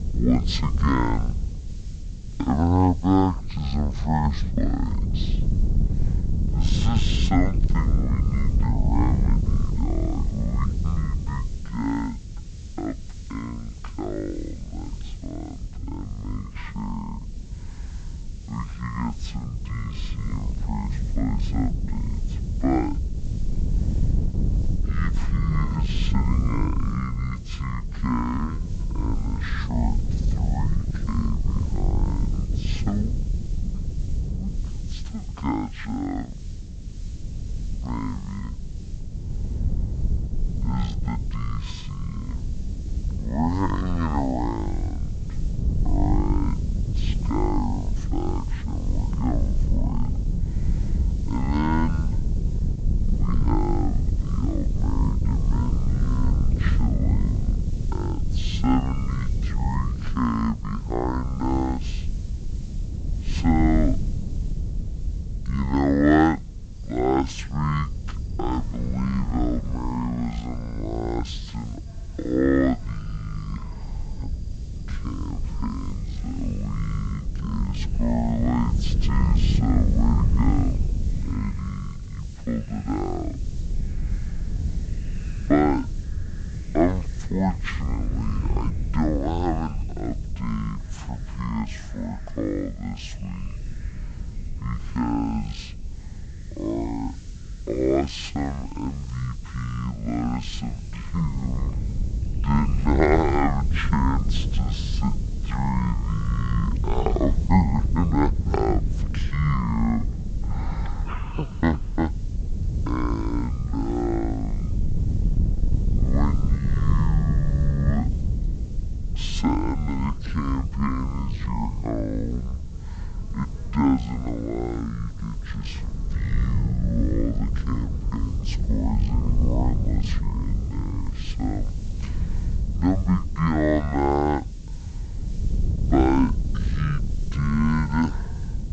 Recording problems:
wrong speed and pitch; too slow and too low; 0.5 times normal speed
high frequencies cut off; noticeable; nothing above 8 kHz
wind noise on the microphone; occasional gusts; 10 dB below the speech
animal sounds; faint; throughout; 30 dB below the speech
hiss; faint; throughout; 25 dB below the speech

